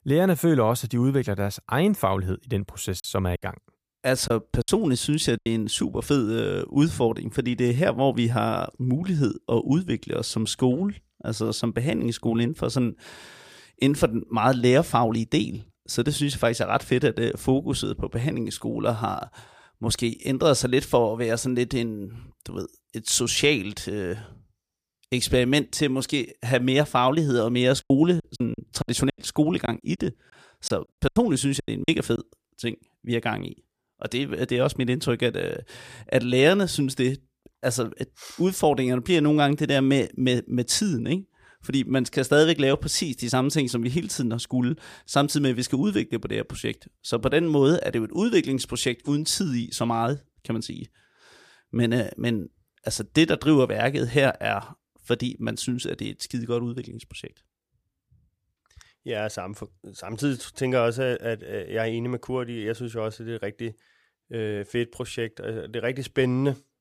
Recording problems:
choppy; very; from 3 to 5.5 s and from 28 to 32 s; 14% of the speech affected

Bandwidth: 15 kHz